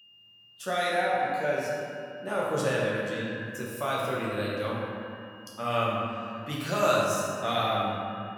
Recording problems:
echo of what is said; strong; throughout; 210 ms later, 10 dB below the speech
room echo; strong; dies away in 2 s
off-mic speech; far
high-pitched whine; faint; throughout; 3 kHz, 25 dB below the speech

